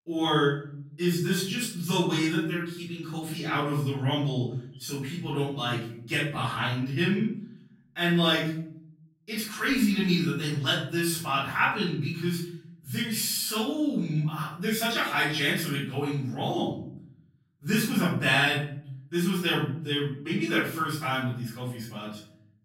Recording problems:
off-mic speech; far
room echo; noticeable; dies away in 0.7 s

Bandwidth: 16 kHz